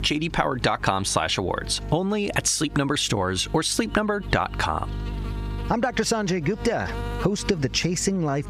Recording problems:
squashed, flat; heavily
electrical hum; noticeable; throughout; 50 Hz, 20 dB below the speech

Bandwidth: 15.5 kHz